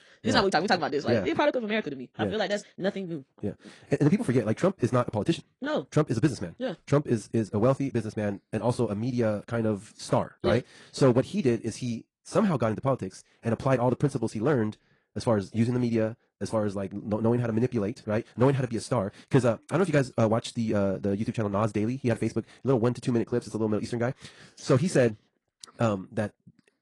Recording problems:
wrong speed, natural pitch; too fast; 1.8 times normal speed
garbled, watery; slightly; nothing above 10.5 kHz

